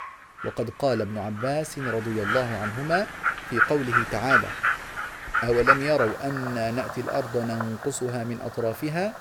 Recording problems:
animal sounds; very loud; throughout; 1 dB above the speech

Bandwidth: 18.5 kHz